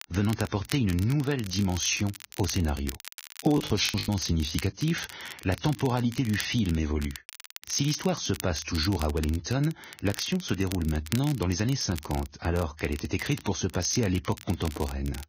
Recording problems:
garbled, watery; badly; nothing above 6.5 kHz
crackle, like an old record; noticeable; 15 dB below the speech
choppy; very; at 3.5 s; 6% of the speech affected

